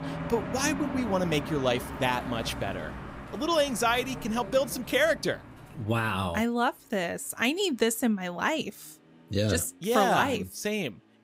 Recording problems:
traffic noise; noticeable; throughout; 10 dB below the speech

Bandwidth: 15.5 kHz